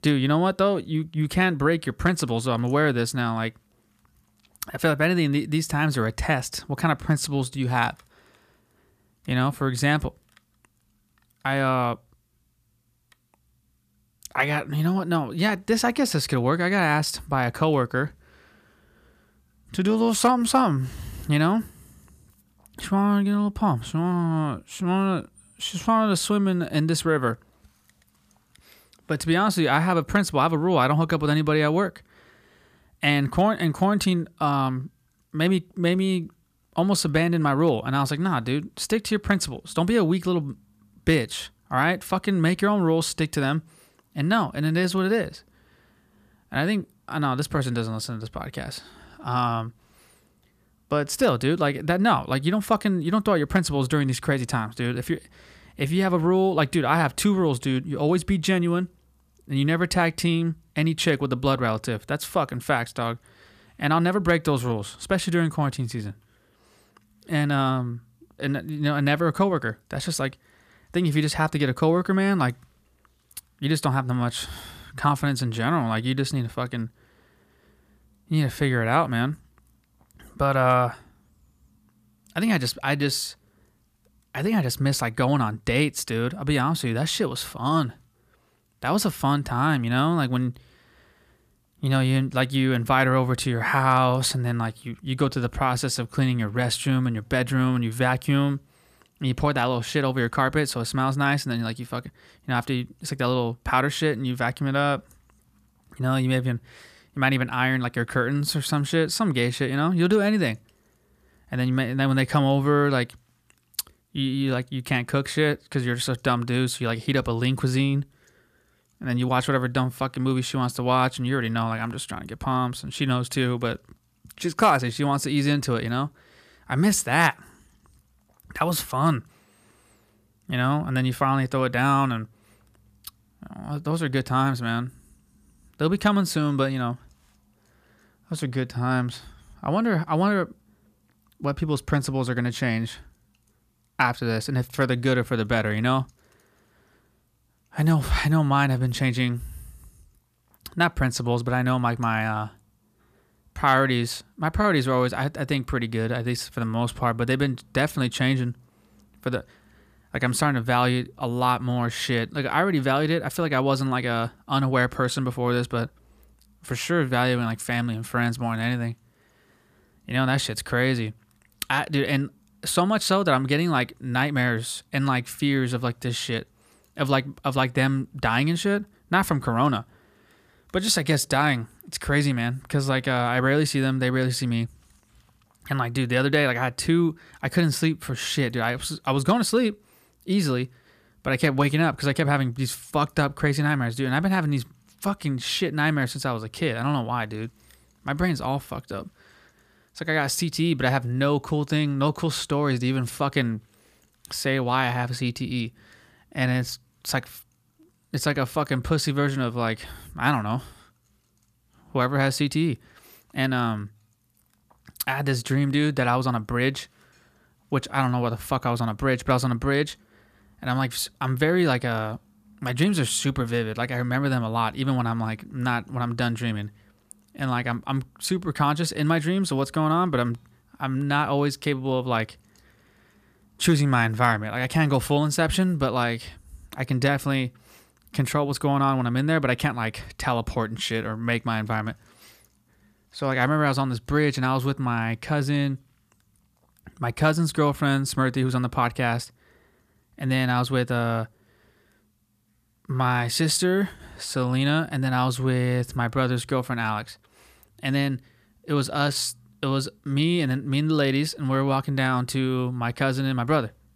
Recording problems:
none

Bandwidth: 14.5 kHz